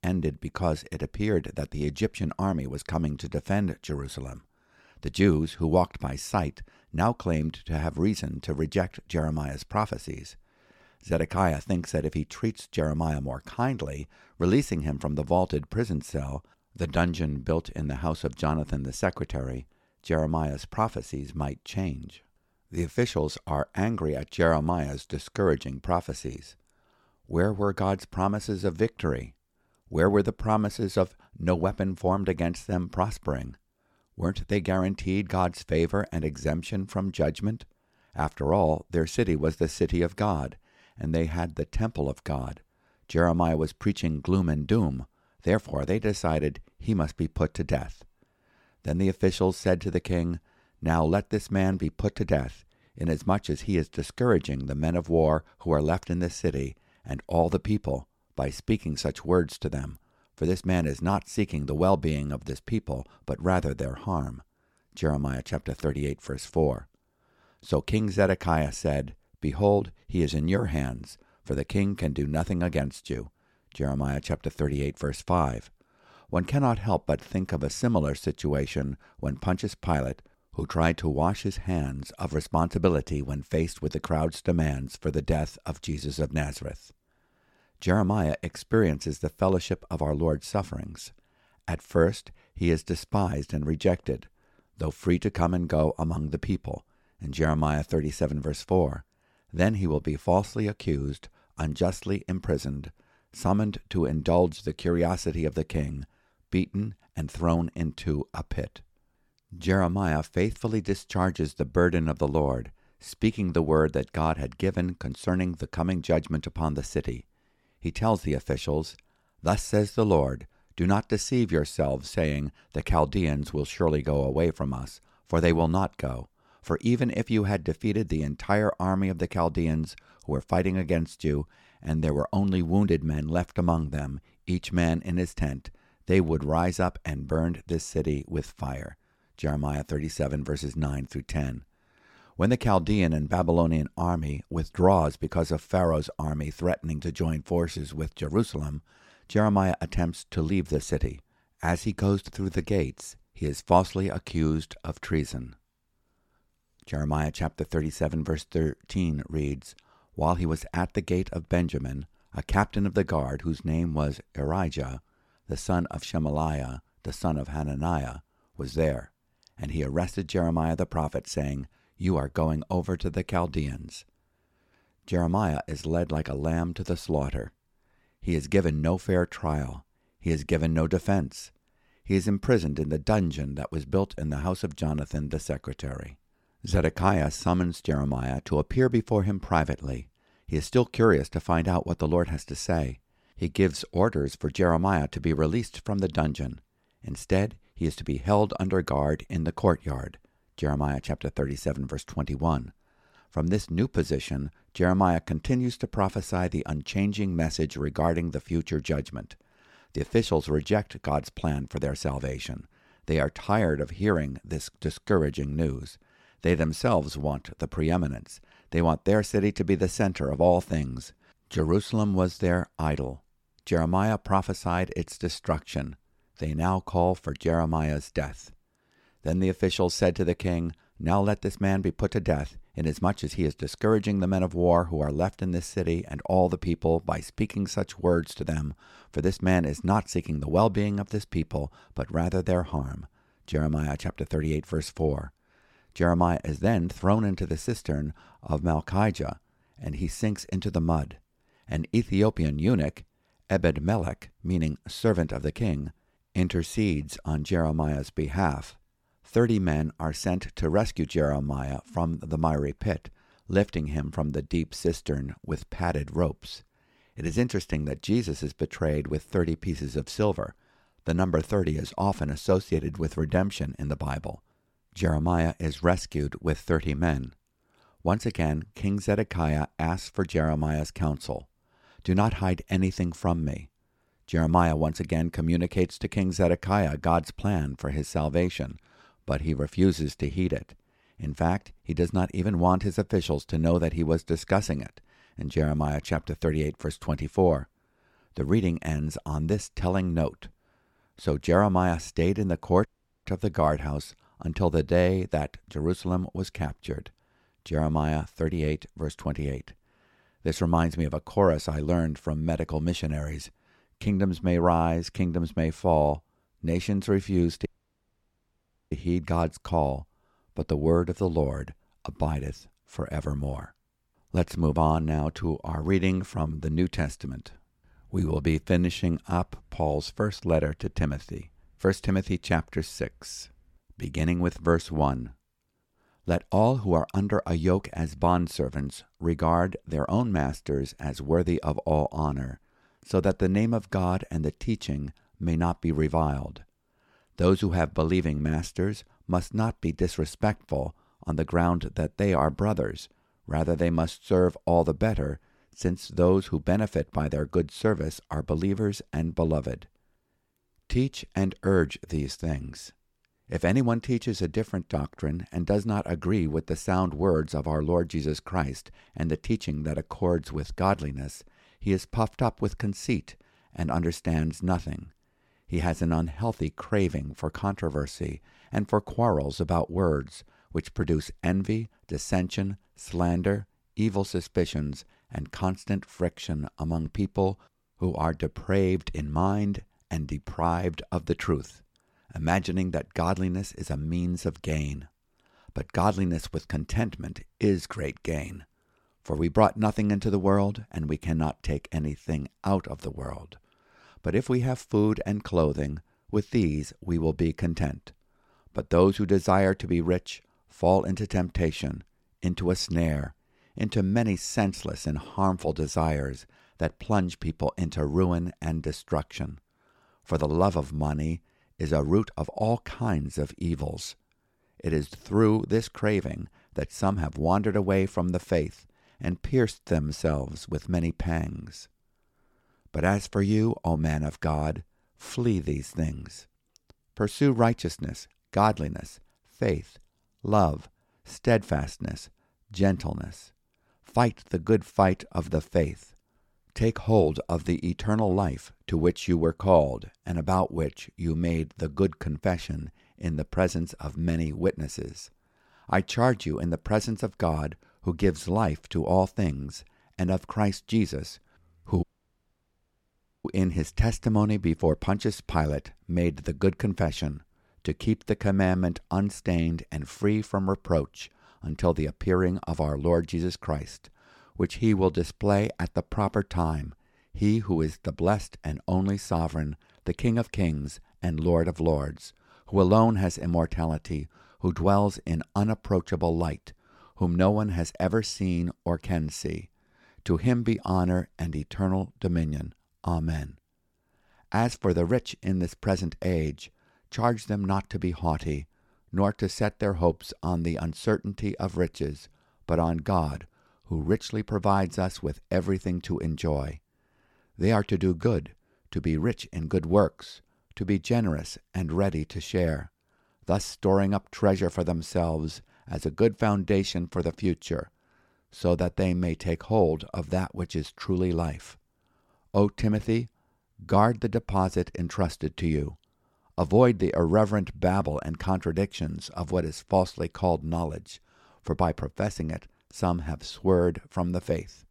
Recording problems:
audio cutting out; at 5:03, at 5:18 for 1.5 s and at 7:42 for 1.5 s

